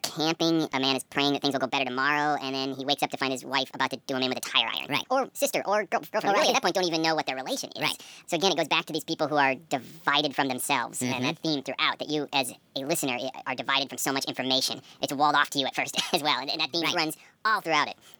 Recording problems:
wrong speed and pitch; too fast and too high; 1.6 times normal speed

